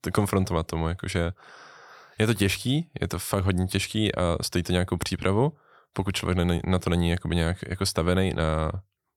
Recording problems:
none

